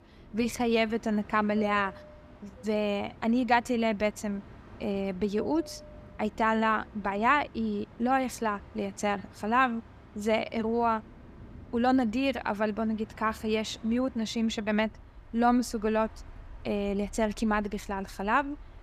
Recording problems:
train or aircraft noise; faint; throughout; 20 dB below the speech

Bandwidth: 14.5 kHz